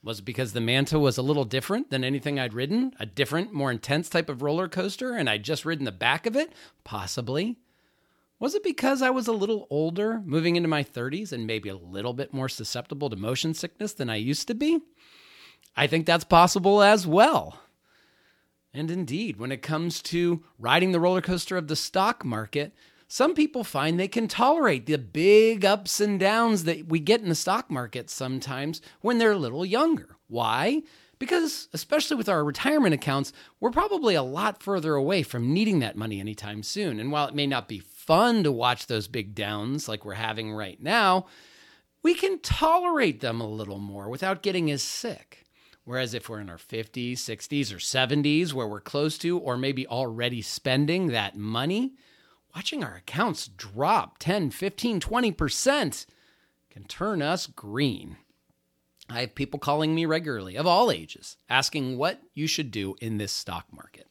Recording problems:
none

